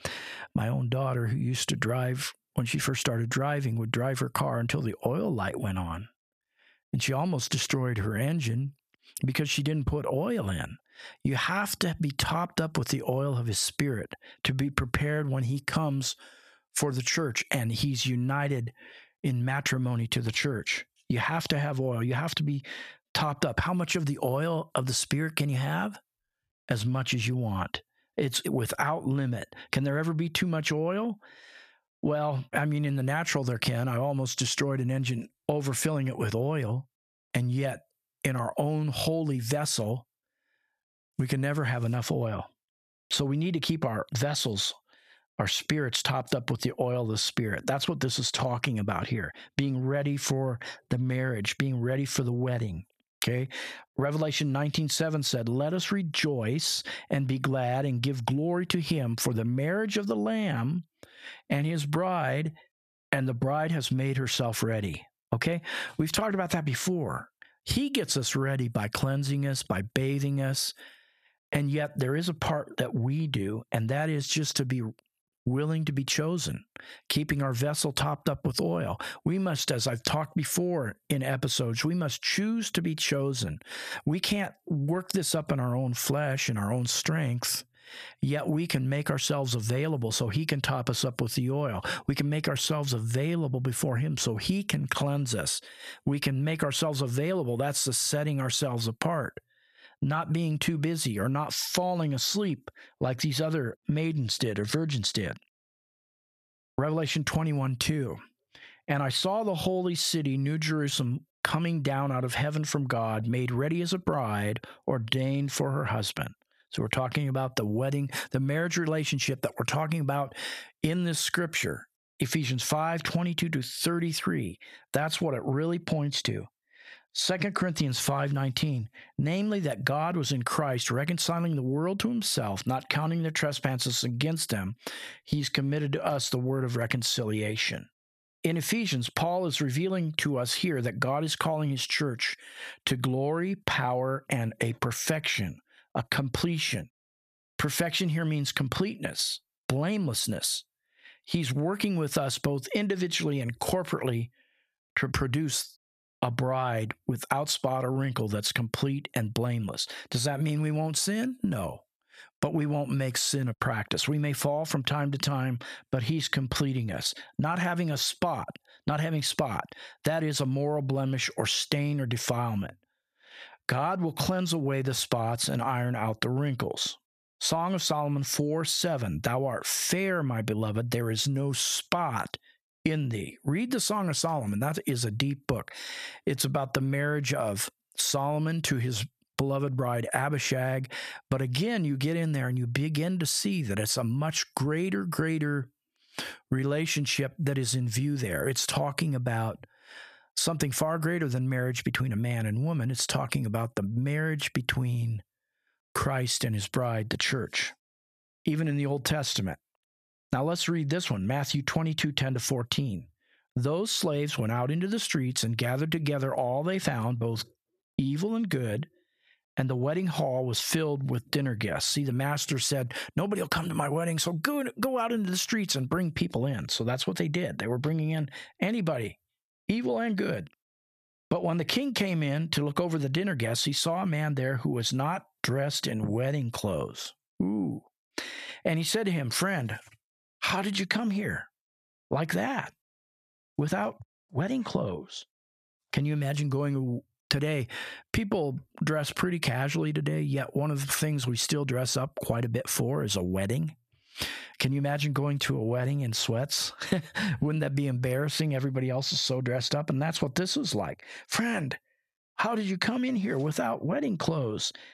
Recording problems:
squashed, flat; somewhat

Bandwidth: 14.5 kHz